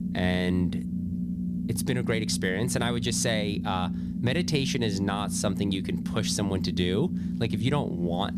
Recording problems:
low rumble; loud; throughout; 8 dB below the speech

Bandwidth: 14.5 kHz